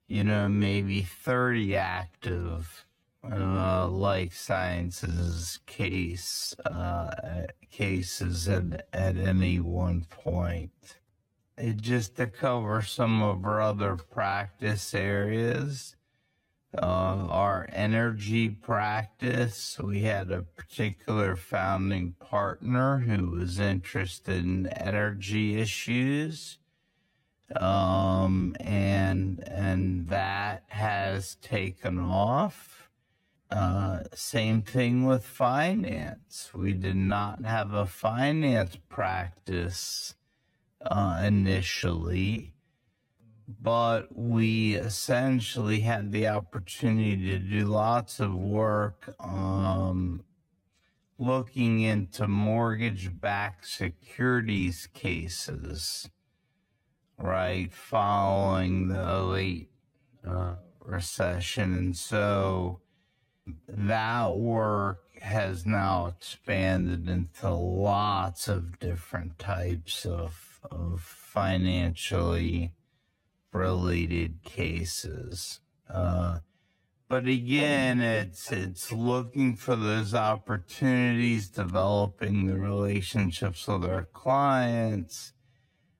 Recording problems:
wrong speed, natural pitch; too slow; 0.5 times normal speed

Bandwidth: 16.5 kHz